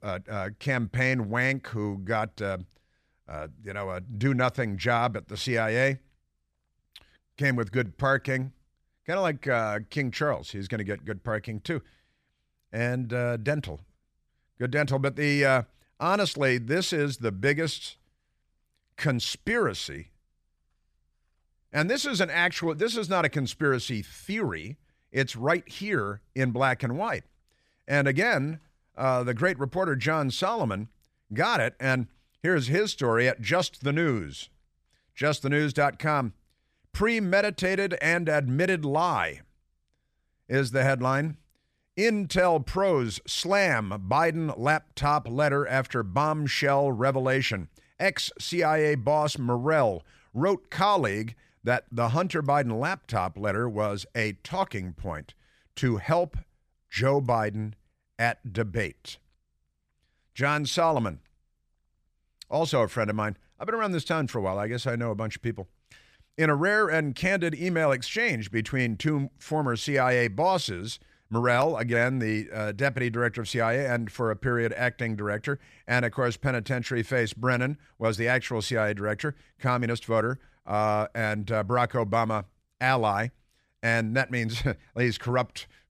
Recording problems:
none

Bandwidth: 14.5 kHz